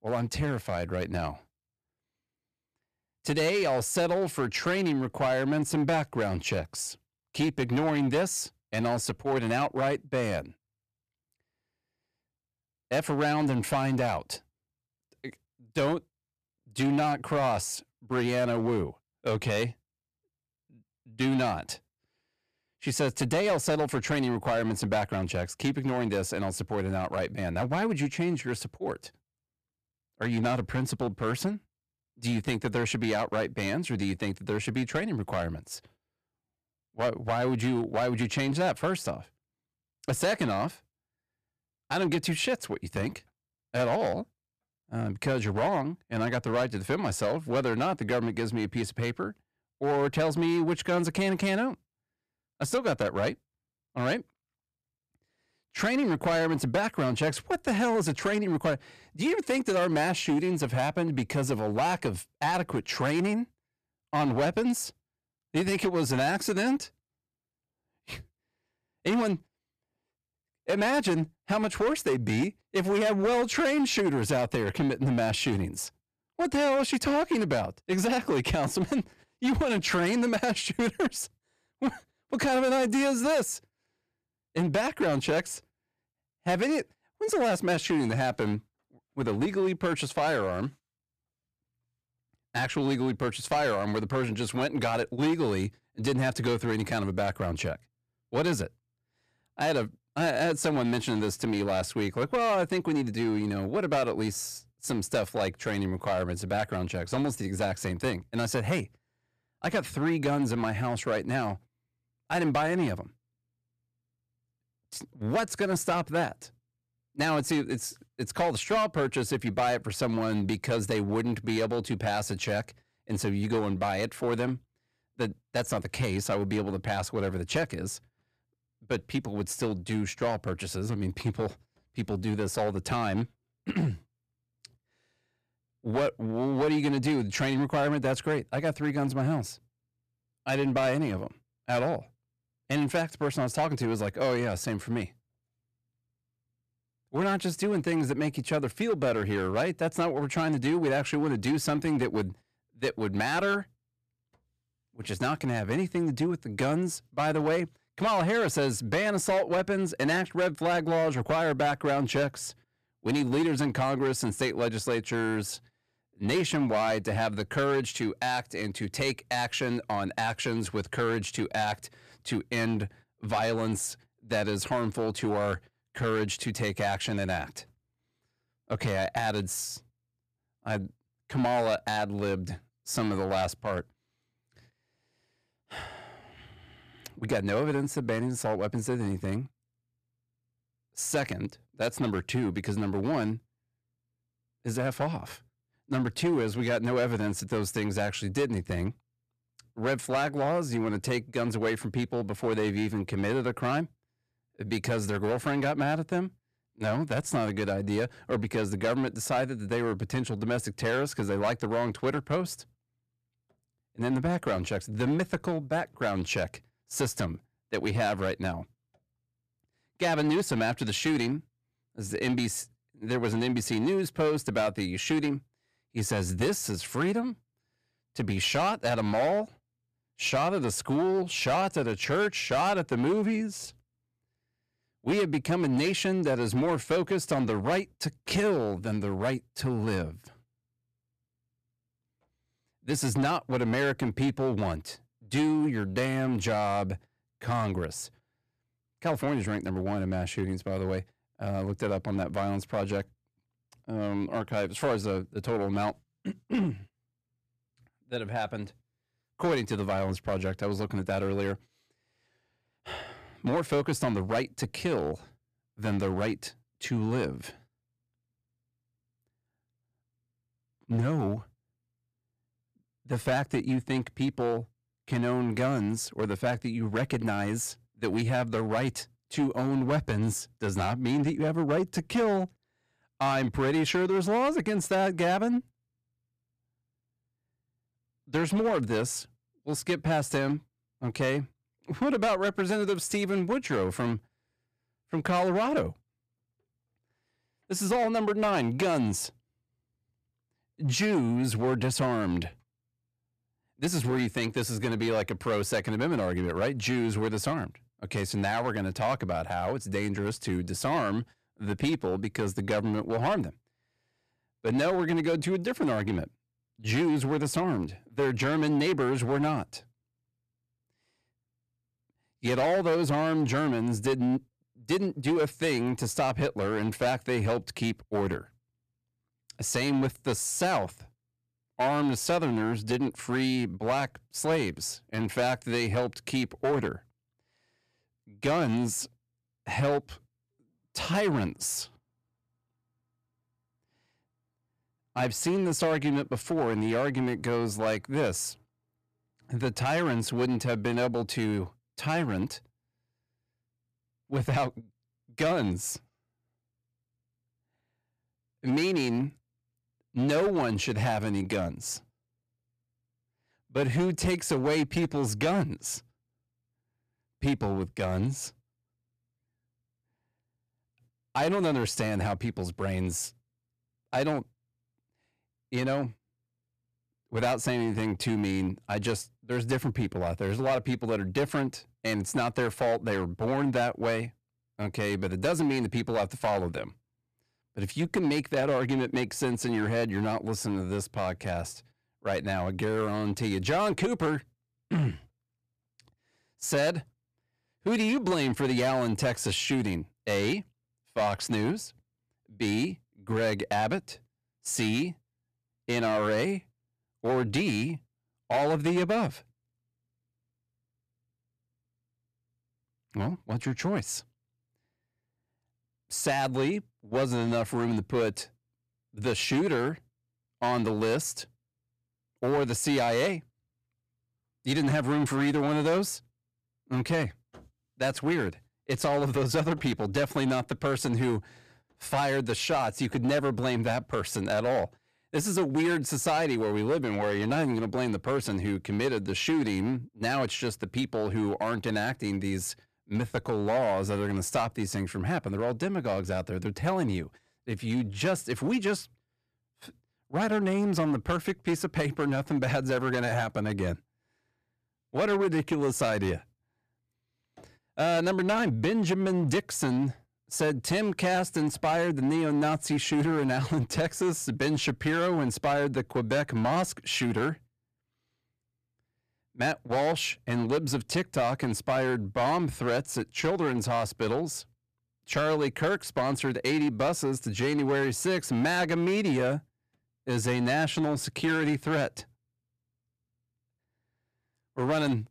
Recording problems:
distortion; slight; 7% of the sound clipped

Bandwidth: 14.5 kHz